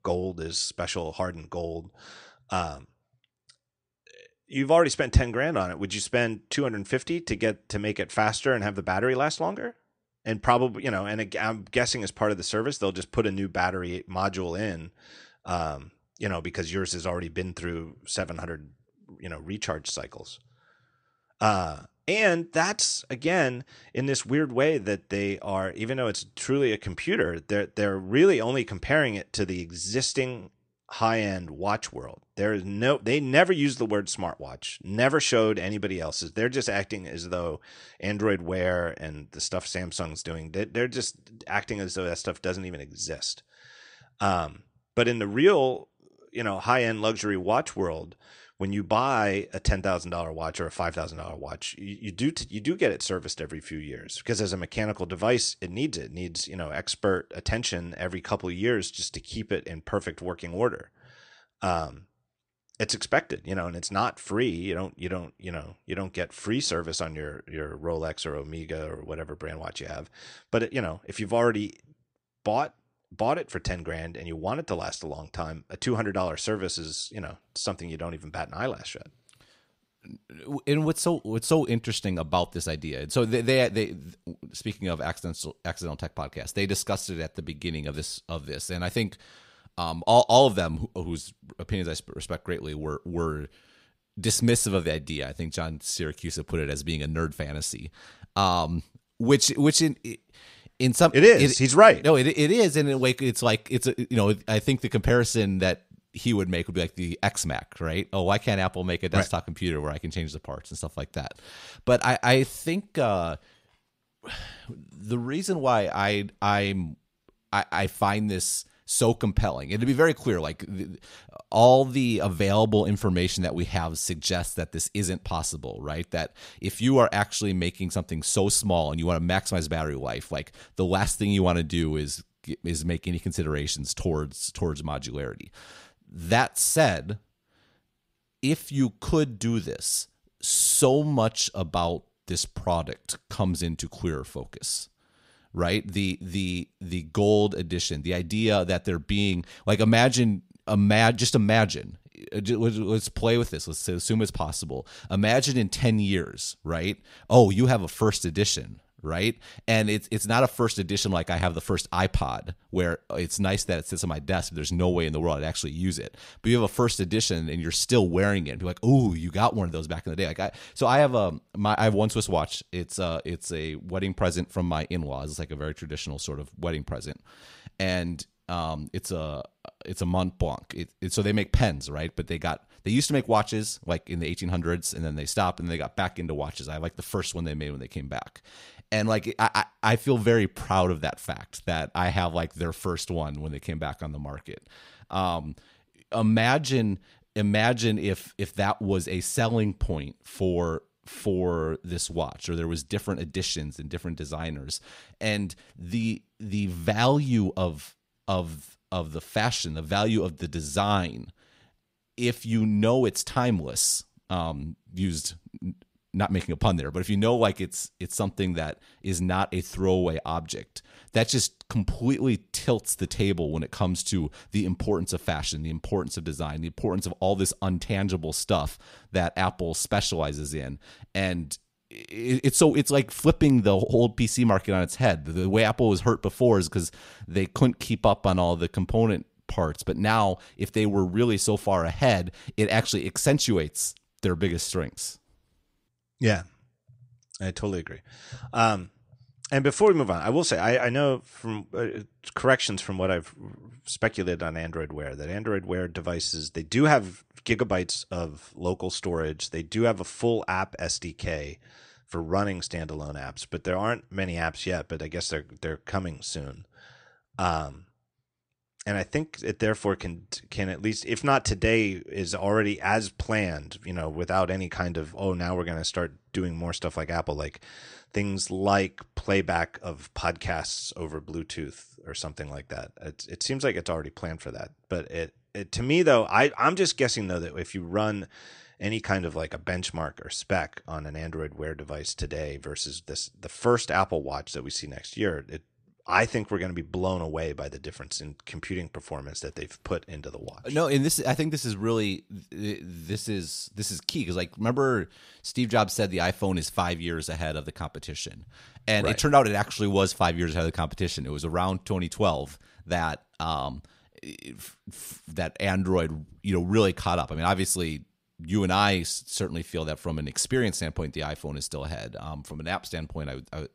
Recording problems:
none

